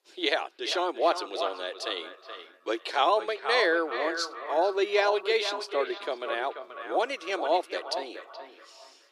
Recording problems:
echo of what is said; strong; throughout; 420 ms later, 9 dB below the speech
thin; very; fading below 350 Hz
uneven, jittery; strongly; from 0.5 to 7 s

